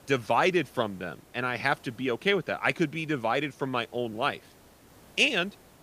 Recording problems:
hiss; faint; throughout; 25 dB below the speech

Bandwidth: 15 kHz